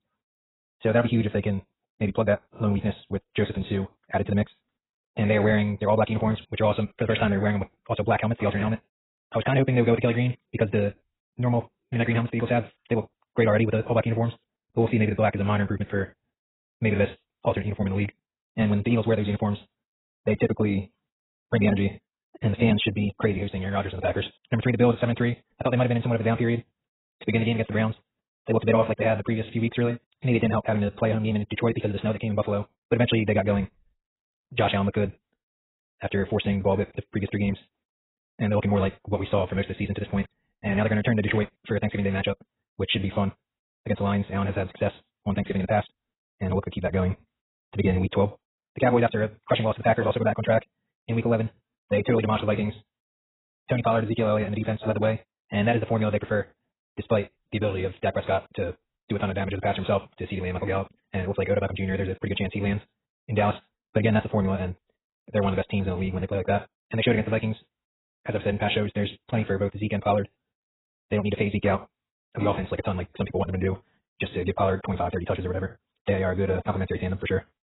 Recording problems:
garbled, watery; badly; nothing above 4 kHz
wrong speed, natural pitch; too fast; 1.7 times normal speed

